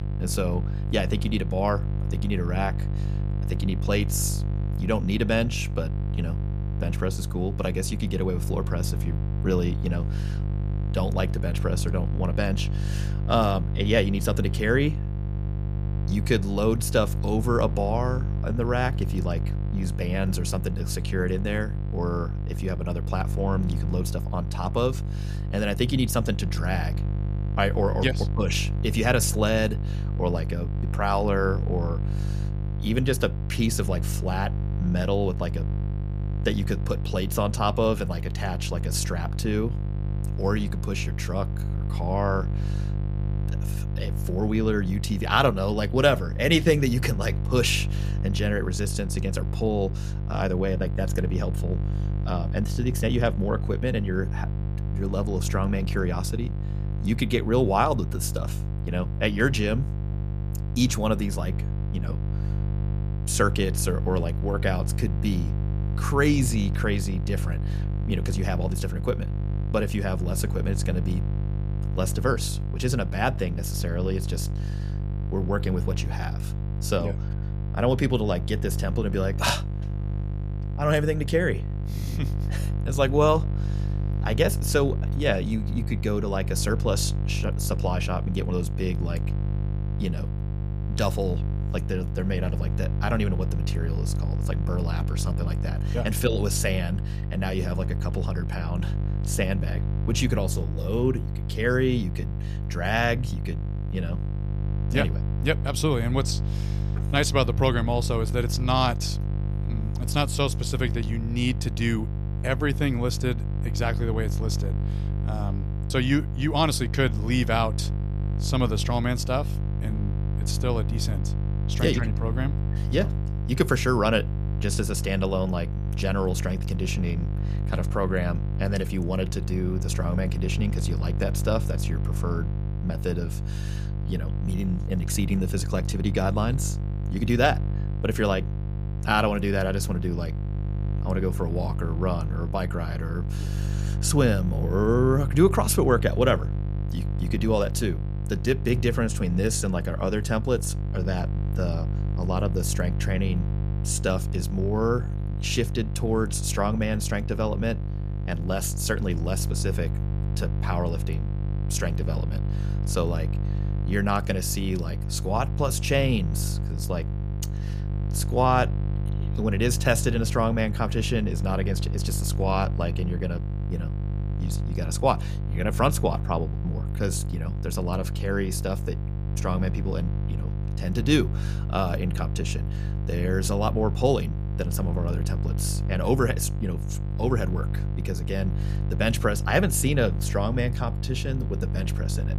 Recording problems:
electrical hum; noticeable; throughout; 50 Hz, 10 dB below the speech

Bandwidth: 14.5 kHz